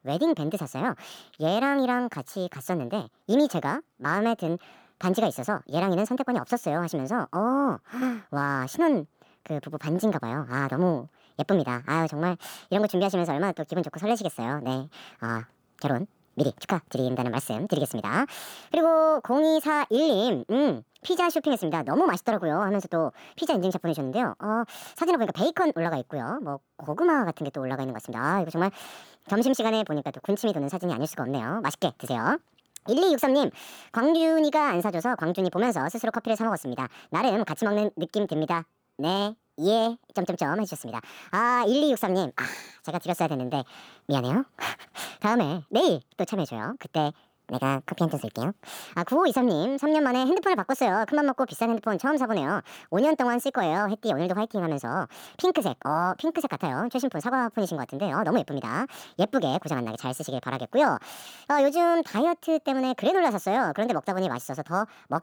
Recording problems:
wrong speed and pitch; too fast and too high; 1.5 times normal speed

